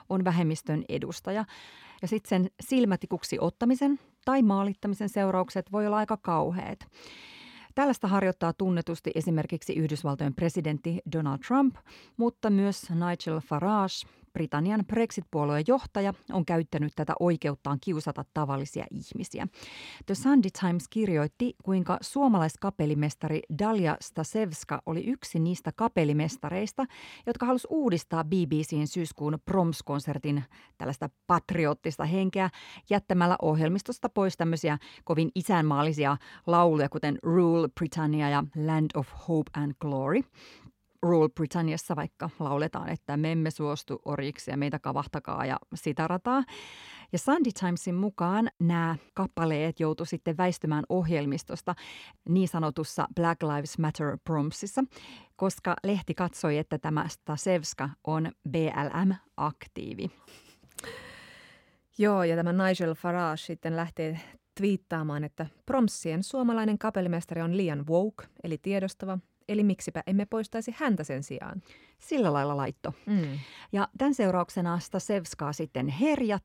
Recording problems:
none

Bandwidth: 16.5 kHz